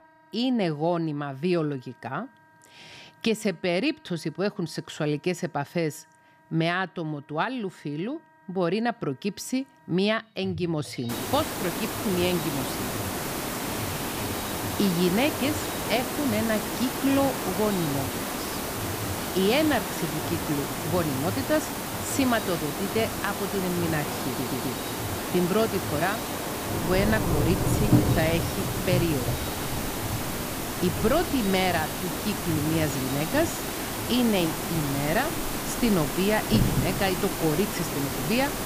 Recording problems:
rain or running water; loud; from 11 s on; 7 dB below the speech
hiss; loud; from 11 s on; 3 dB below the speech
background music; noticeable; throughout; 15 dB below the speech
audio stuttering; at 24 s

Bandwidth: 15 kHz